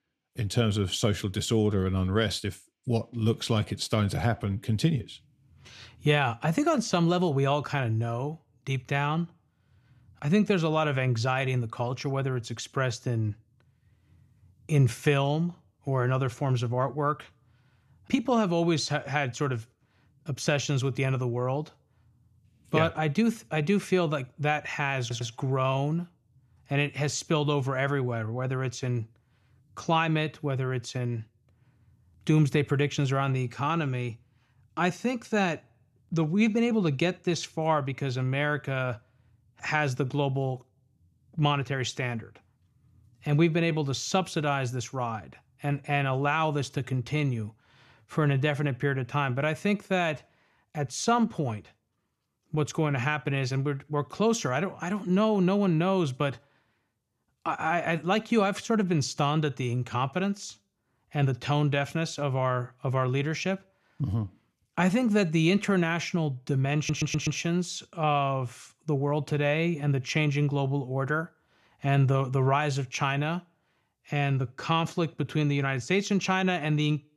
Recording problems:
audio stuttering; at 25 s and at 1:07

